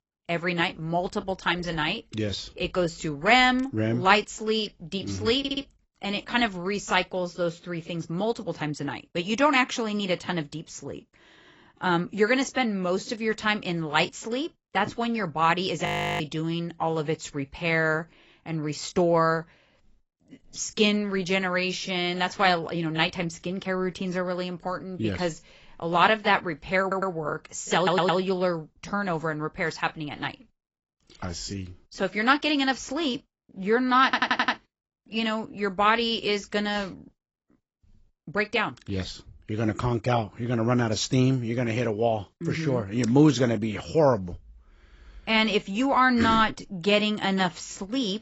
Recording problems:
garbled, watery; badly; nothing above 7.5 kHz
audio stuttering; 4 times, first at 5.5 s
audio freezing; at 16 s

